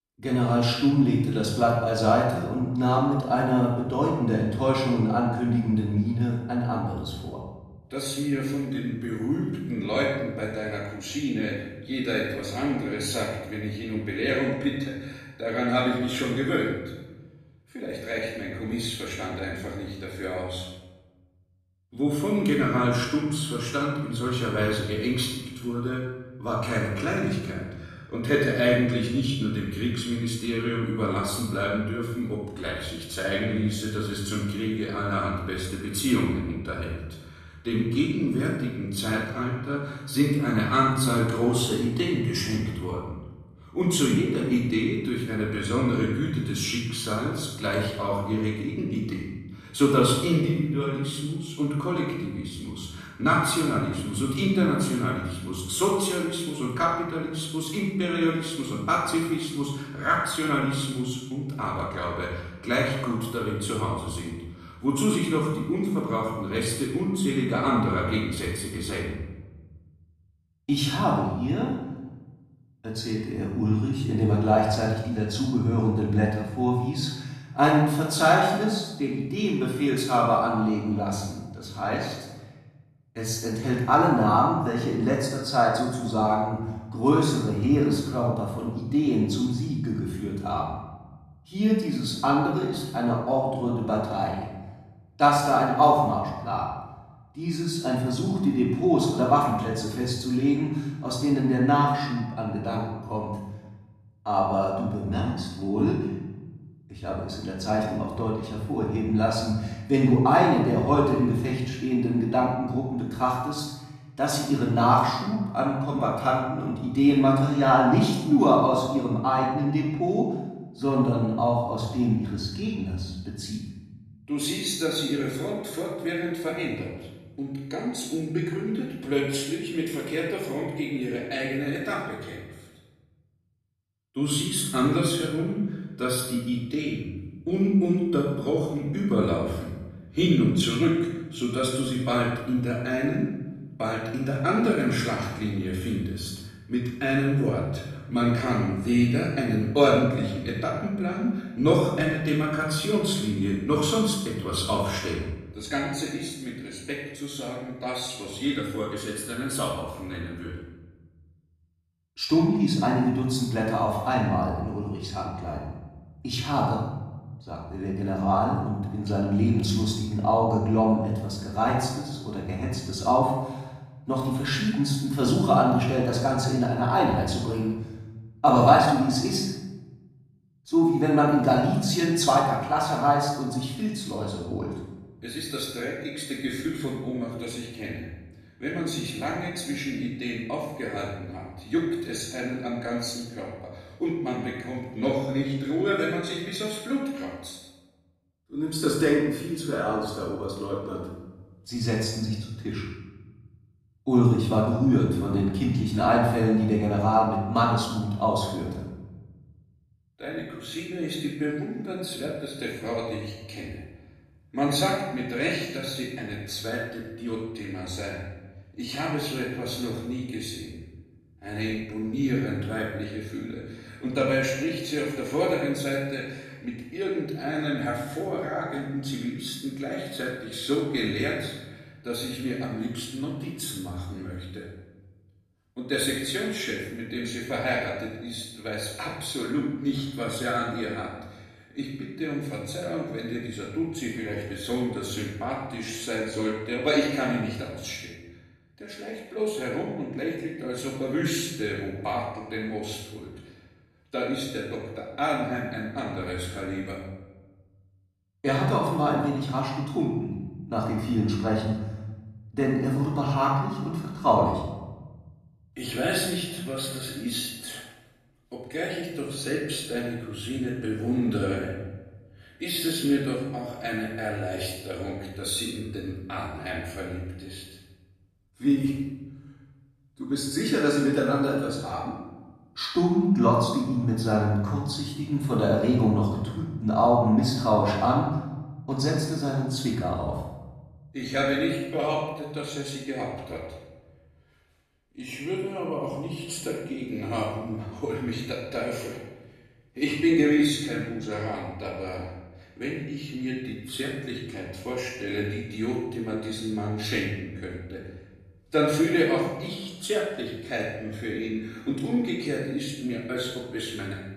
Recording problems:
off-mic speech; far
room echo; noticeable; dies away in 1.1 s

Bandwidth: 13.5 kHz